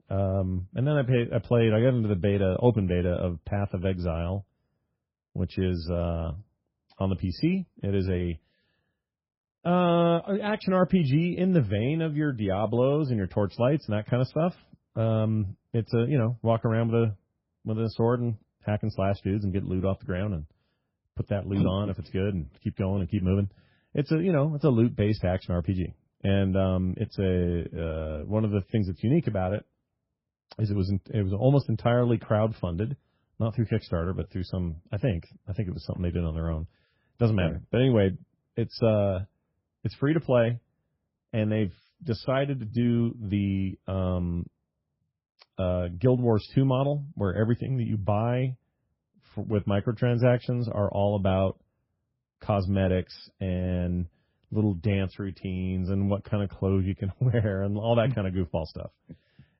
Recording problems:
garbled, watery; badly; nothing above 5.5 kHz
muffled; very slightly; fading above 1.5 kHz

